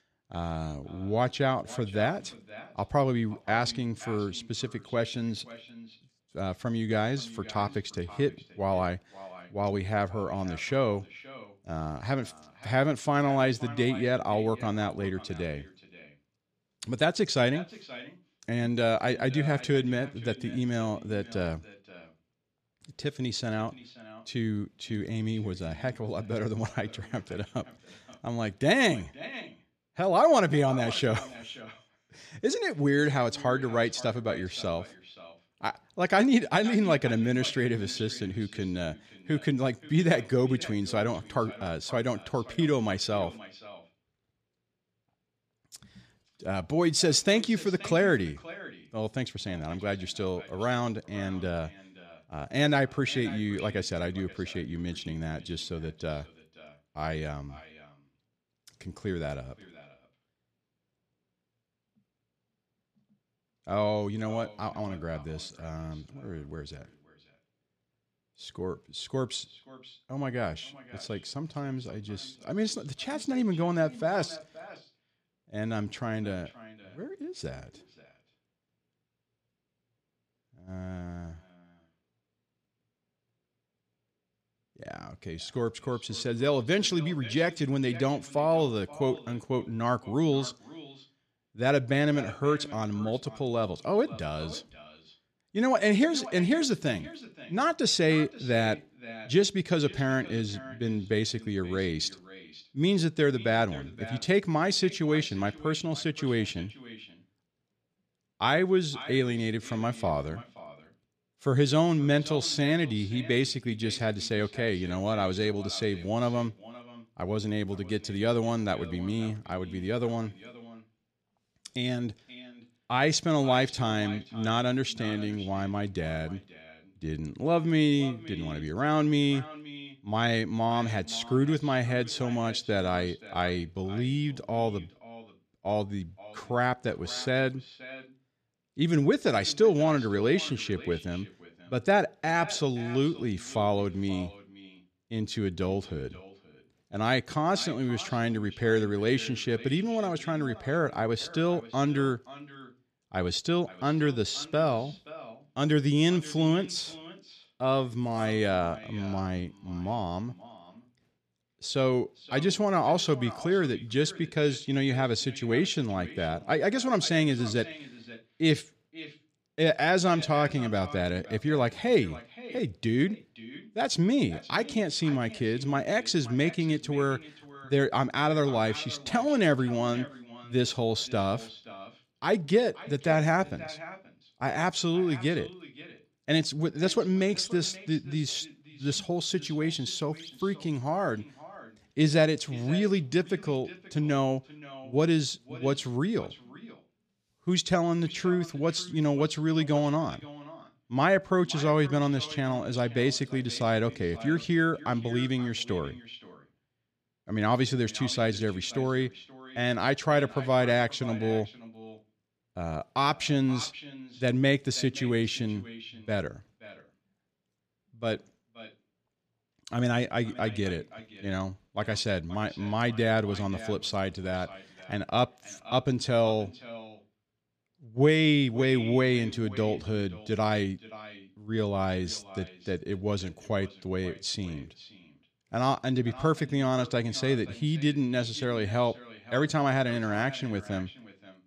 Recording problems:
echo of what is said; noticeable; throughout; 530 ms later, 20 dB below the speech

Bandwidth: 14.5 kHz